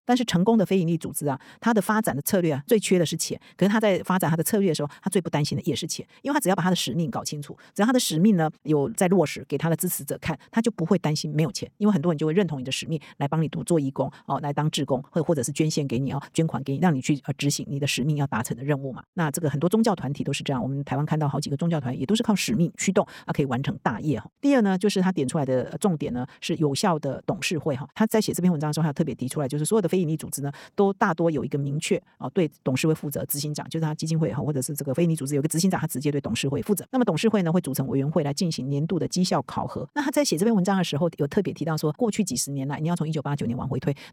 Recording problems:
wrong speed, natural pitch; too fast; 1.5 times normal speed

